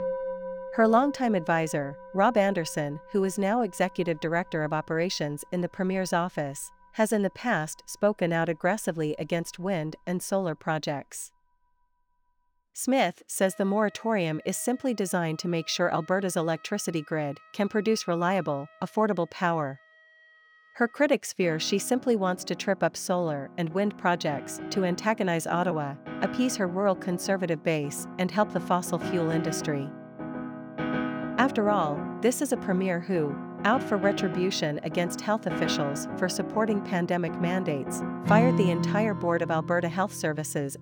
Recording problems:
background music; loud; throughout; 7 dB below the speech

